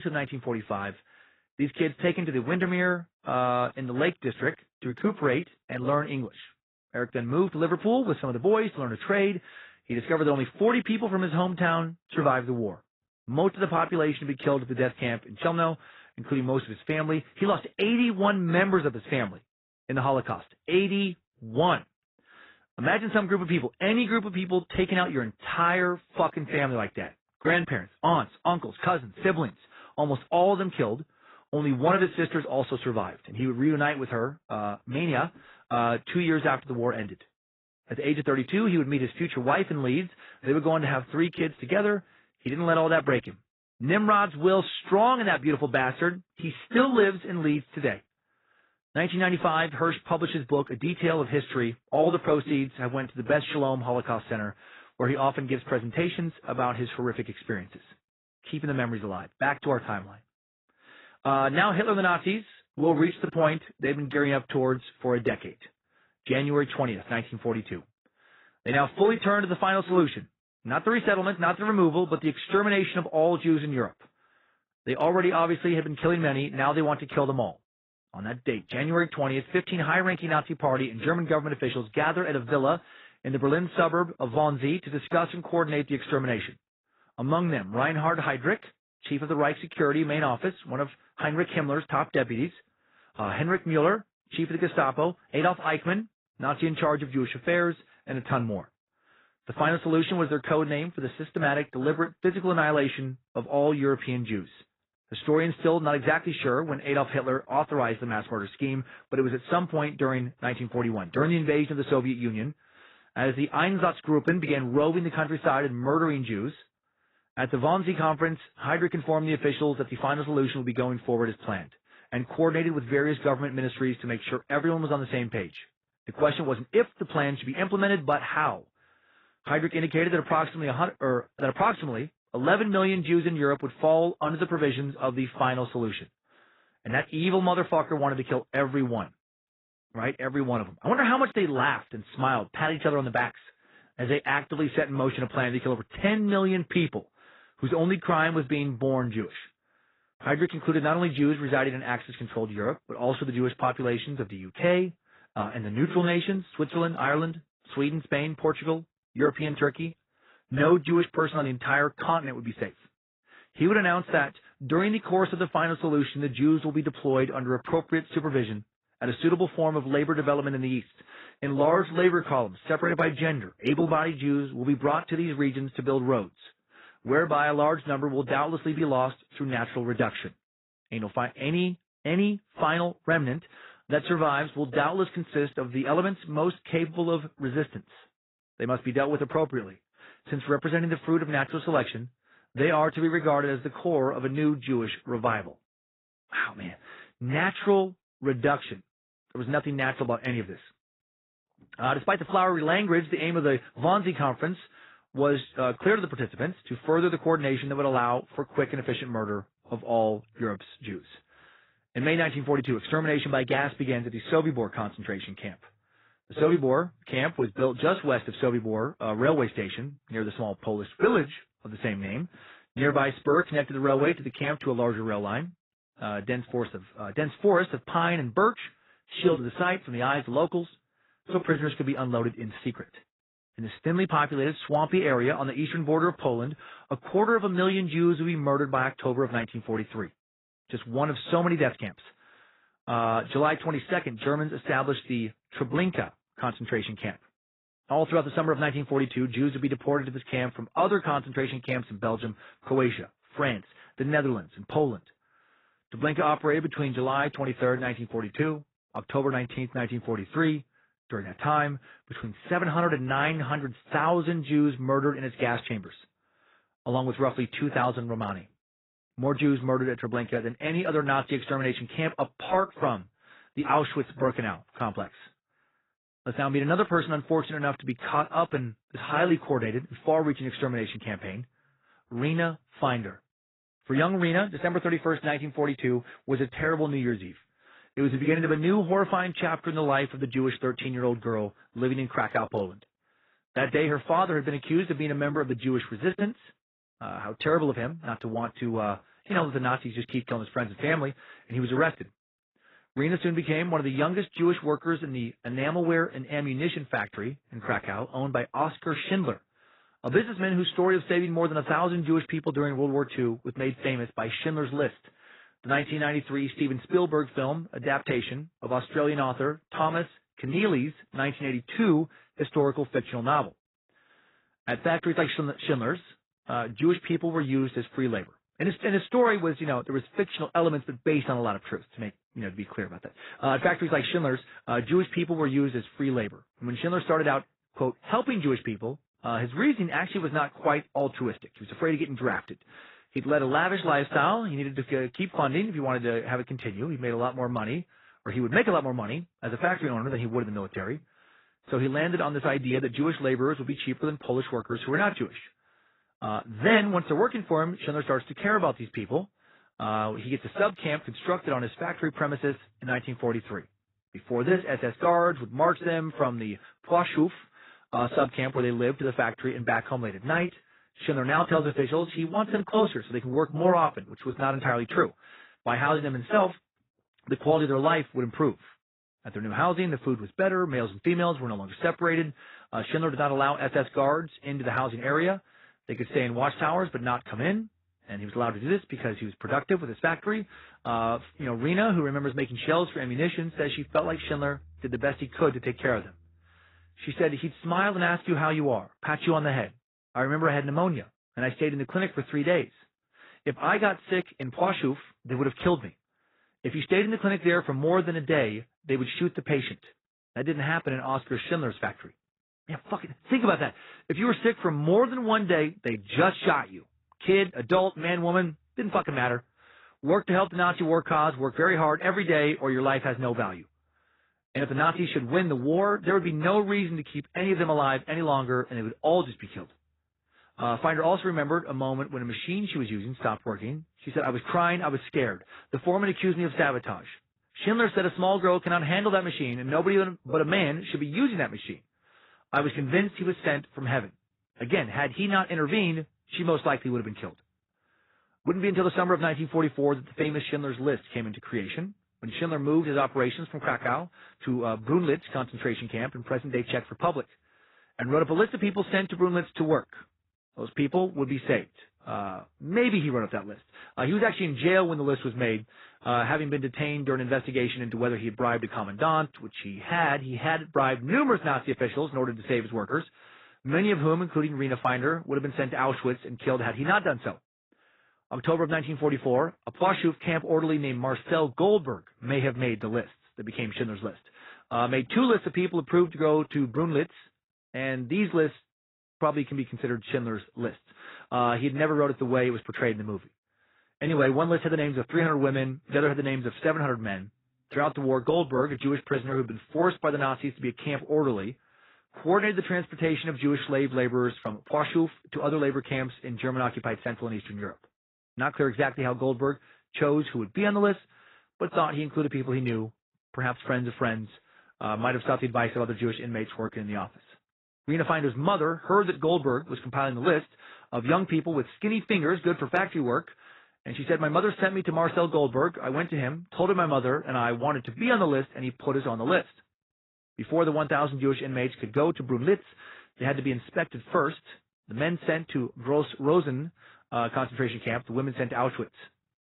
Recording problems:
garbled, watery; badly; nothing above 4 kHz
abrupt cut into speech; at the start

